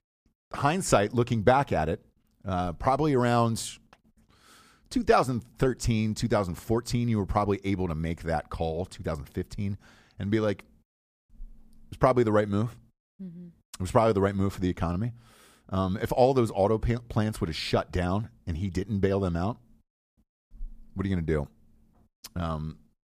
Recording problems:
none

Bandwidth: 15 kHz